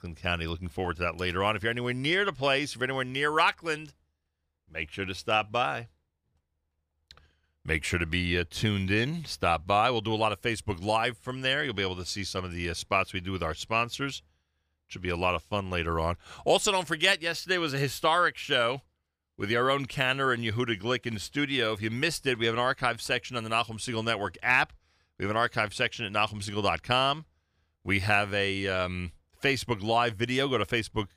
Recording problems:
none

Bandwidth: 15 kHz